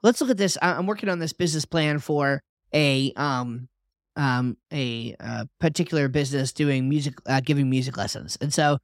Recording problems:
none

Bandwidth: 16 kHz